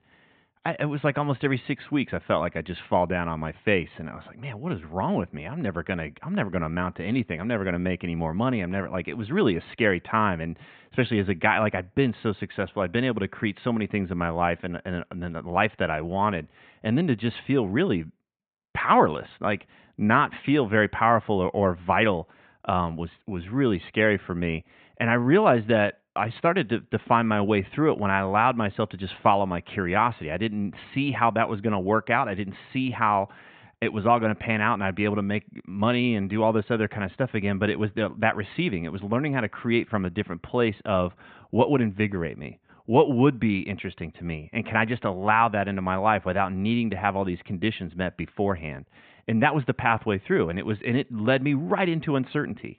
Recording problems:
high frequencies cut off; severe; nothing above 4 kHz
muffled; very slightly; fading above 2.5 kHz

